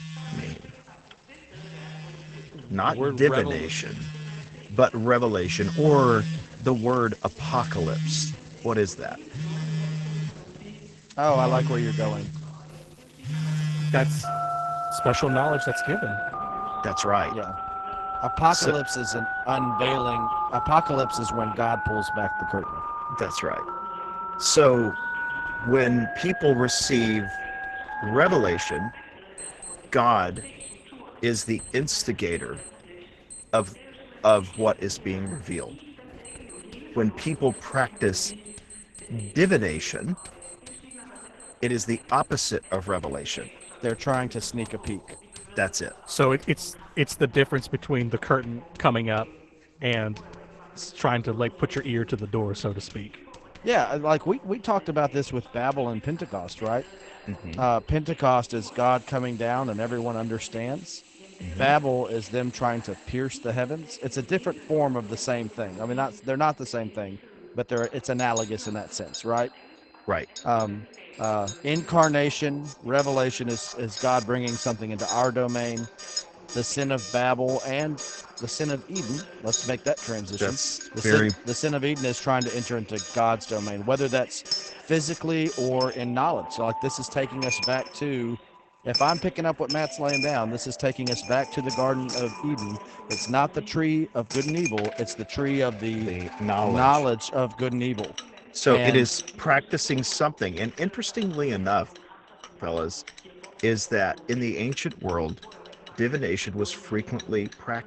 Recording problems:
garbled, watery; badly; nothing above 8 kHz
alarms or sirens; loud; throughout; 8 dB below the speech
household noises; loud; throughout; 9 dB below the speech
voice in the background; faint; throughout; 20 dB below the speech

